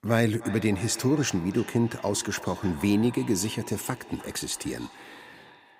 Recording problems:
echo of what is said; noticeable; throughout; 310 ms later, 15 dB below the speech

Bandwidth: 15.5 kHz